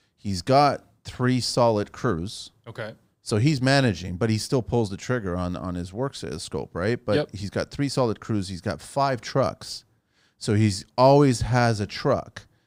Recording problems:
none

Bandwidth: 15.5 kHz